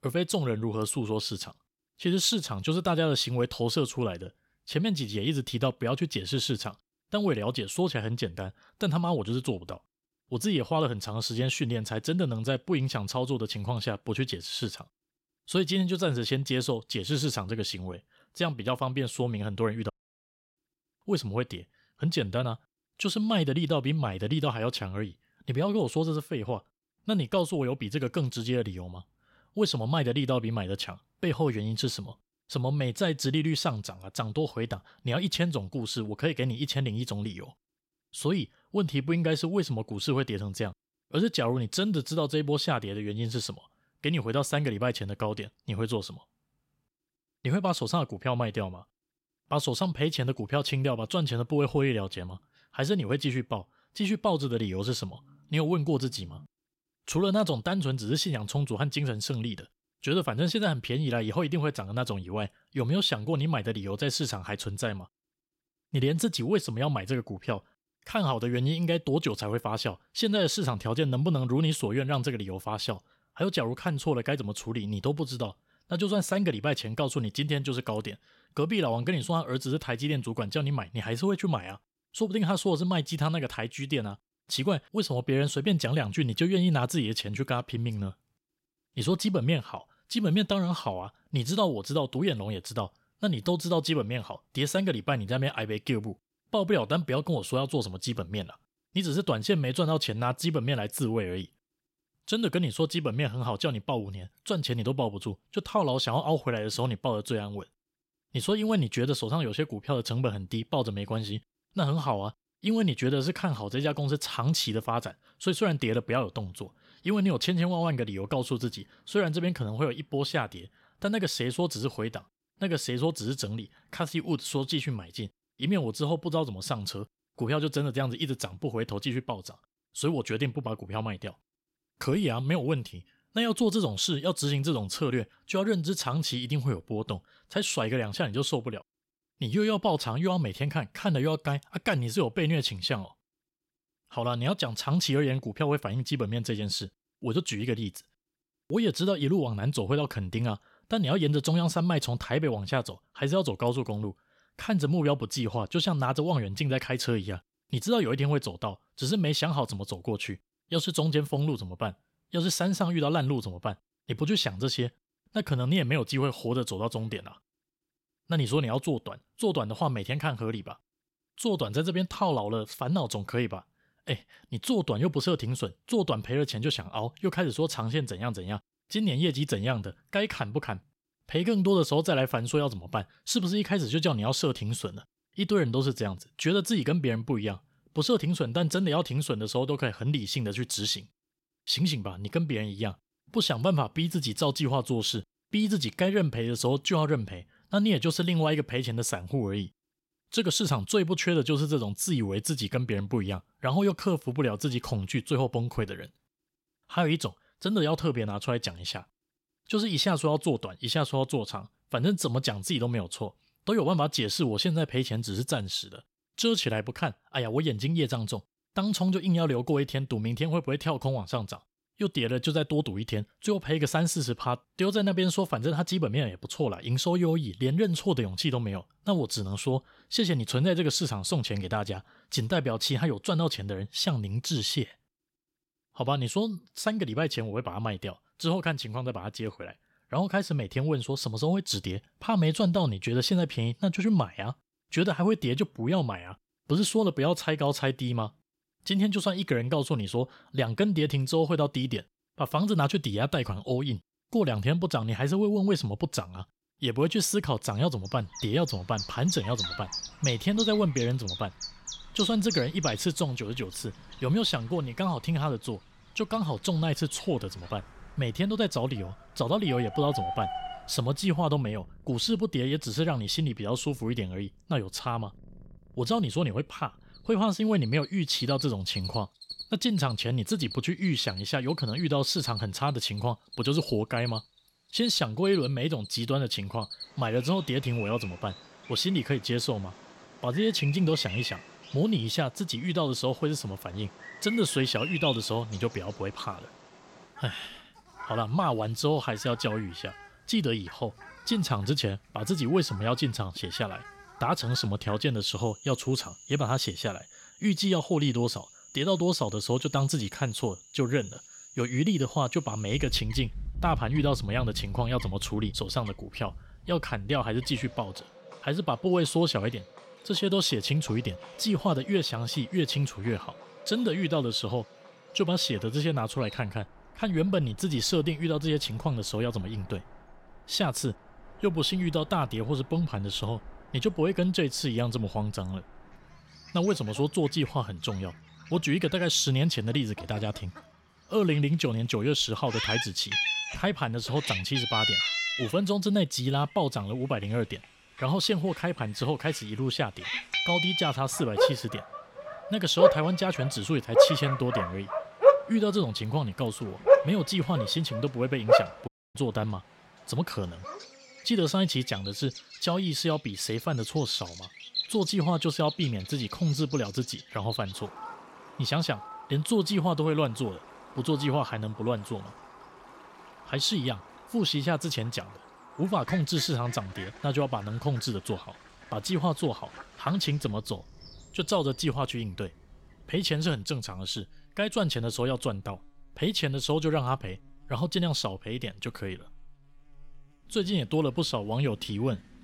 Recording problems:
animal sounds; loud; from 4:18 on; 4 dB below the speech
audio cutting out; at 20 s for 0.5 s and at 5:59

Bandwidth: 16.5 kHz